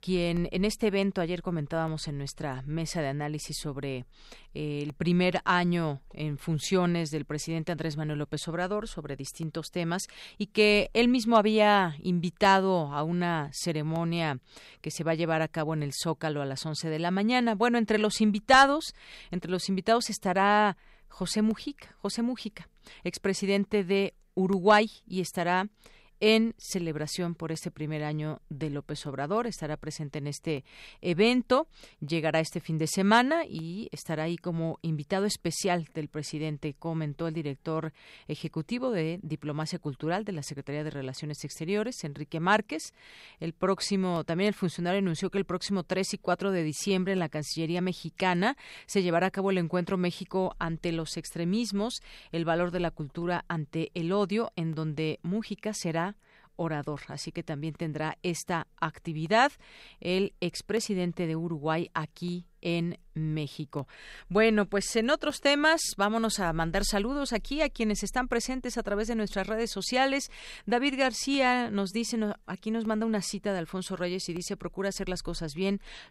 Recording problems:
none

